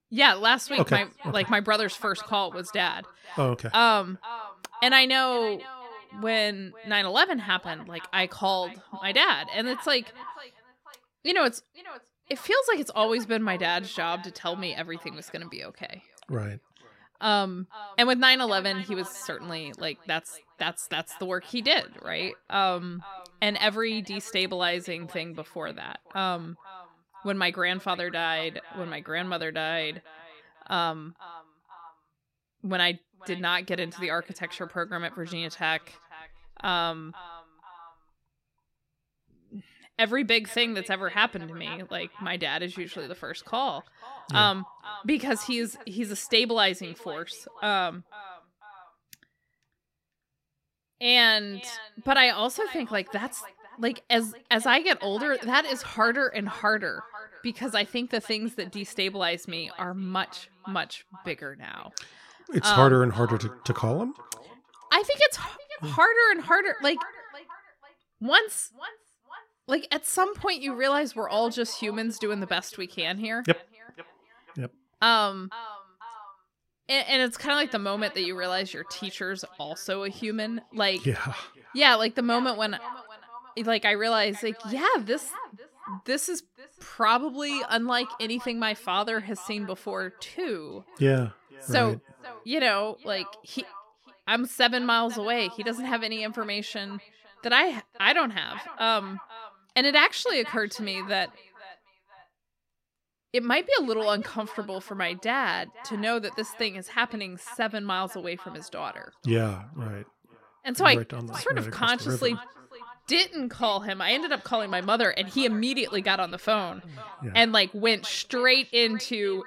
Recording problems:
echo of what is said; faint; throughout; 490 ms later, 20 dB below the speech

